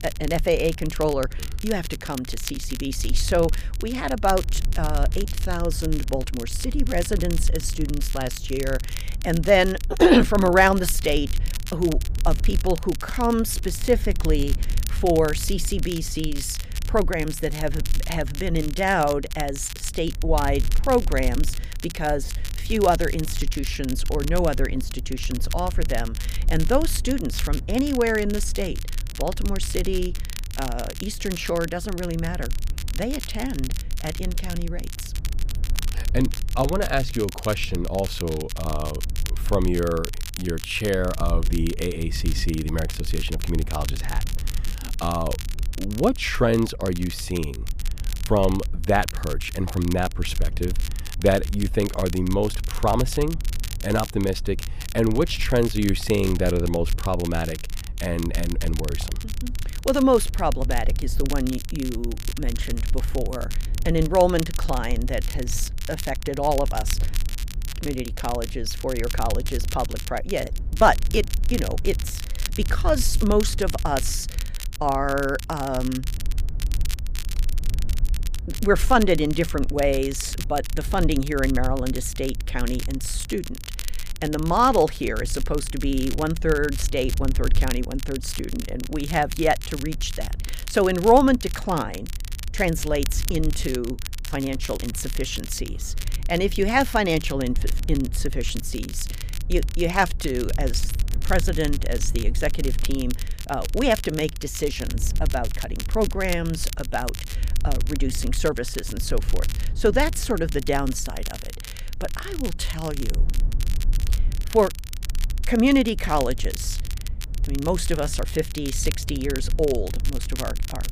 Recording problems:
crackle, like an old record; noticeable; 15 dB below the speech
low rumble; faint; throughout; 25 dB below the speech

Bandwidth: 15 kHz